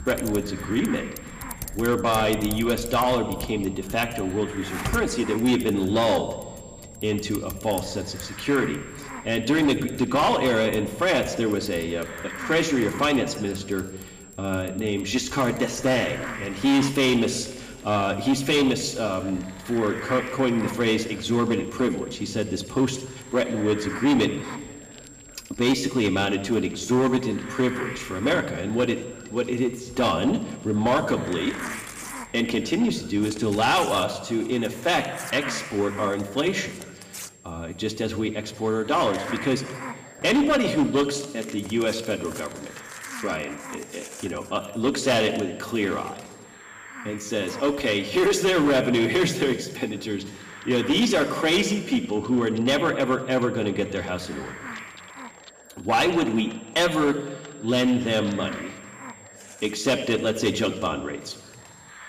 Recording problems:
room echo; slight; dies away in 1.5 s
distortion; slight; 6% of the sound clipped
off-mic speech; somewhat distant
household noises; noticeable; throughout; 20 dB below the speech
hiss; noticeable; throughout; 15 dB below the speech
high-pitched whine; faint; throughout; 7.5 kHz, 25 dB below the speech

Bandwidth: 15 kHz